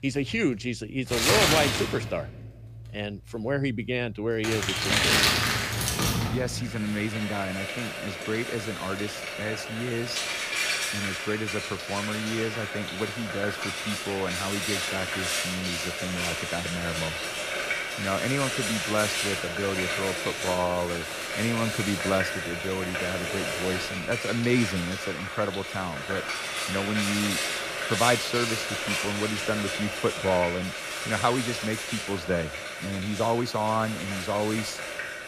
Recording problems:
household noises; very loud; throughout; 1 dB above the speech

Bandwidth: 15 kHz